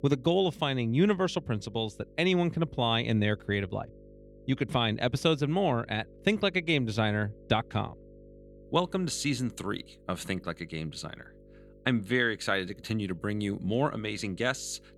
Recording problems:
electrical hum; faint; throughout; 50 Hz, 25 dB below the speech

